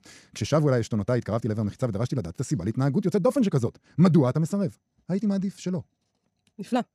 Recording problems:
wrong speed, natural pitch; too fast; 1.5 times normal speed

